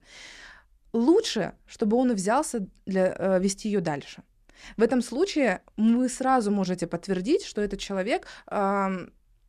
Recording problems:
none

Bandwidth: 14 kHz